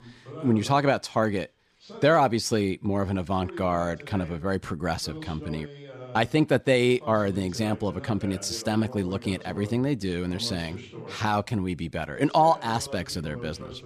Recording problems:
voice in the background; noticeable; throughout; 15 dB below the speech

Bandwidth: 14.5 kHz